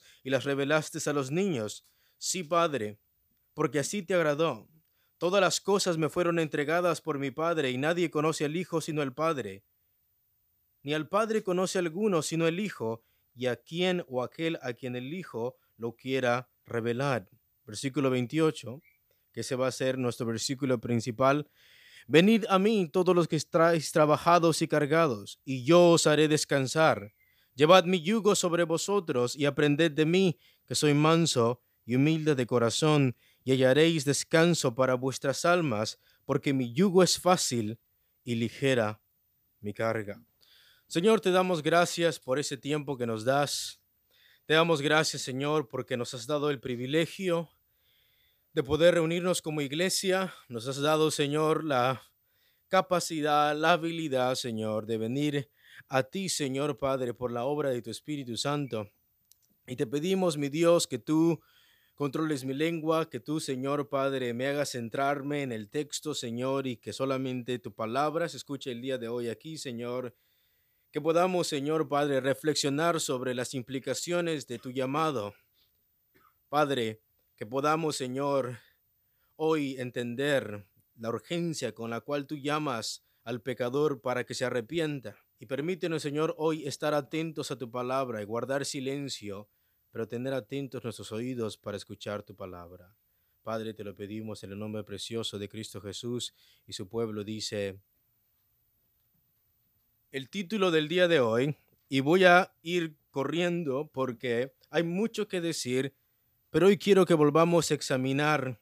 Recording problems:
none

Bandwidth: 15 kHz